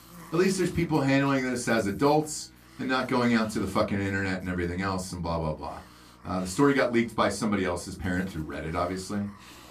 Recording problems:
room echo; very slight; dies away in 0.2 s
off-mic speech; somewhat distant
electrical hum; faint; throughout; 60 Hz, 30 dB below the speech
hiss; faint; throughout; 25 dB below the speech

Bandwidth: 14.5 kHz